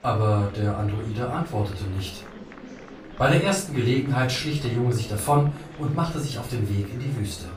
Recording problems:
off-mic speech; far
room echo; slight; dies away in 0.3 s
murmuring crowd; noticeable; throughout; 15 dB below the speech

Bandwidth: 15 kHz